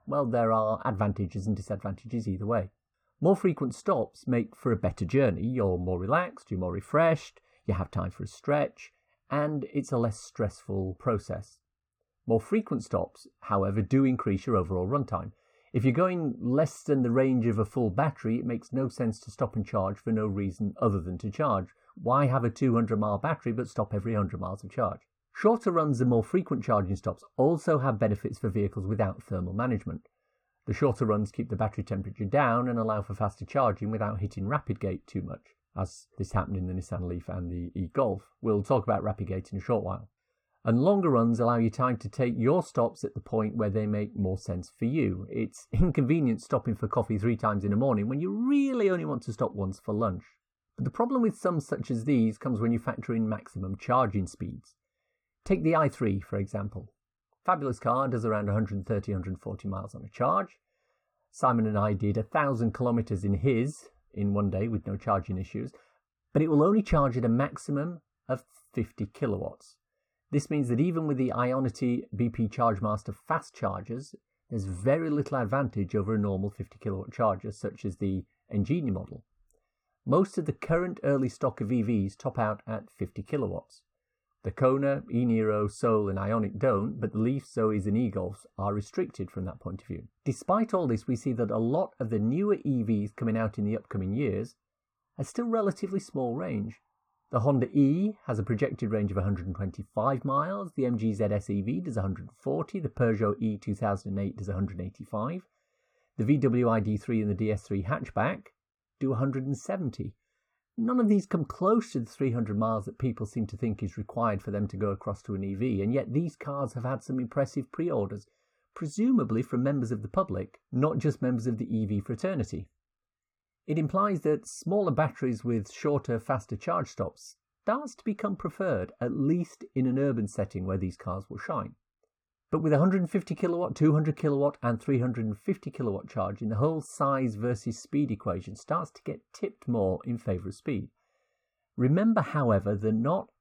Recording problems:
muffled; very; fading above 3.5 kHz

